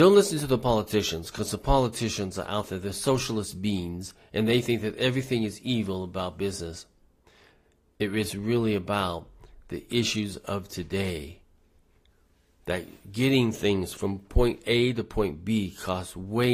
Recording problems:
garbled, watery; slightly; nothing above 15.5 kHz
abrupt cut into speech; at the start and the end

